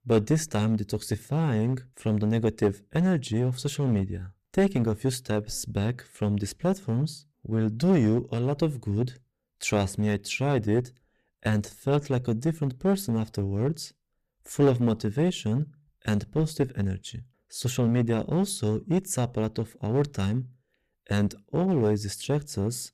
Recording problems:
distortion; slight; 6% of the sound clipped

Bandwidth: 14.5 kHz